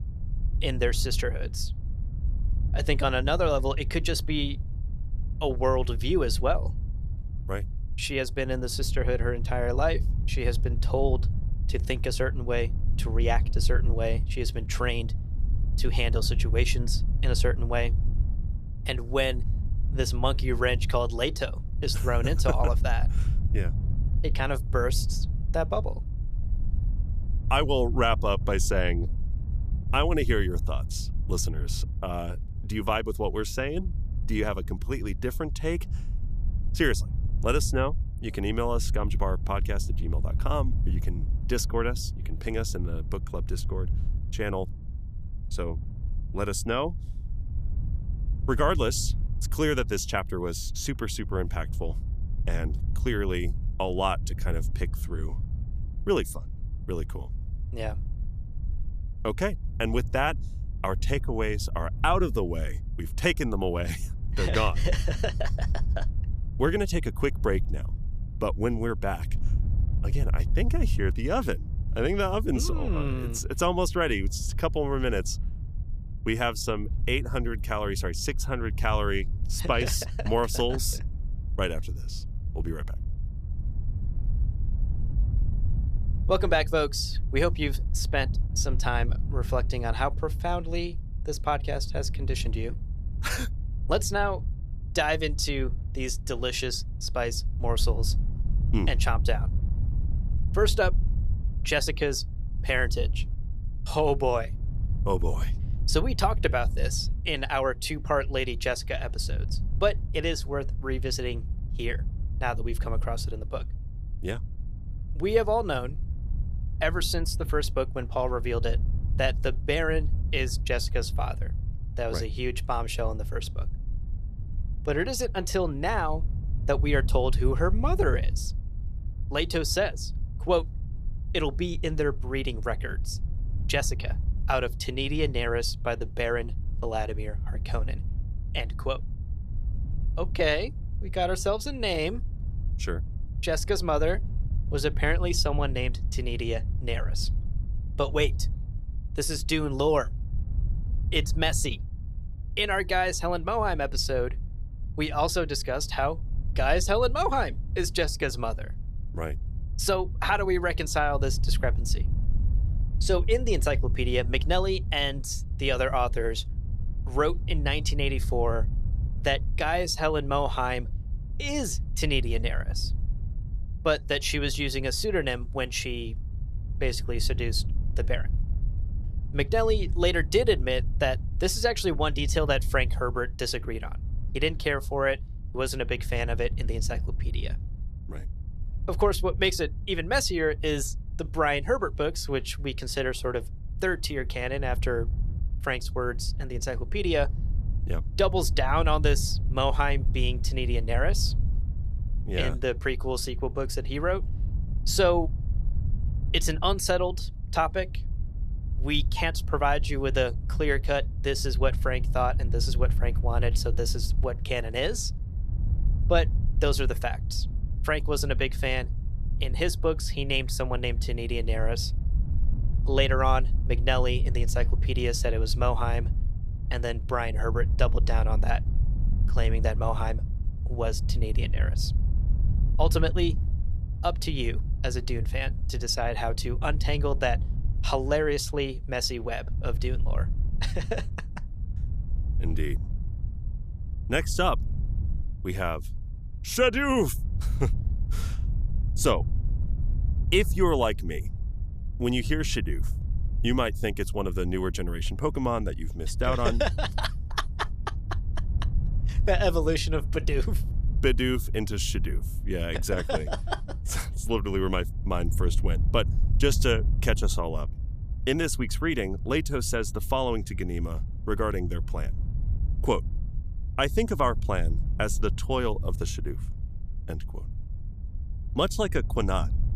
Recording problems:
wind noise on the microphone; occasional gusts; 20 dB below the speech

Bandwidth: 14.5 kHz